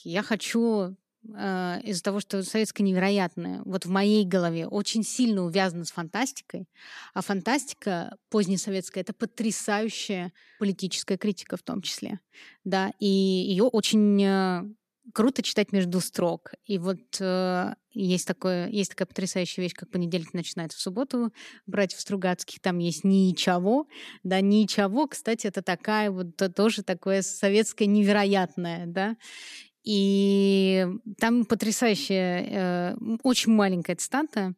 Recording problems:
uneven, jittery; strongly; from 13 to 30 s

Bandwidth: 14.5 kHz